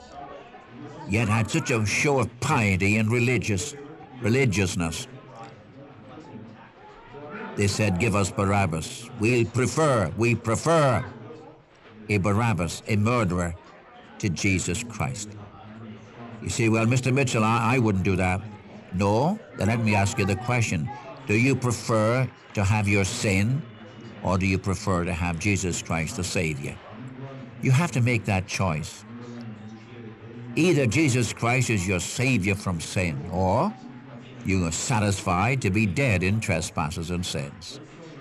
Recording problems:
chatter from many people; noticeable; throughout; 20 dB below the speech

